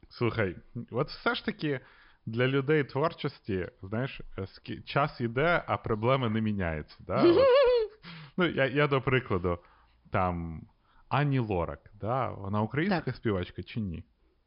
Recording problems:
high frequencies cut off; noticeable; nothing above 5.5 kHz

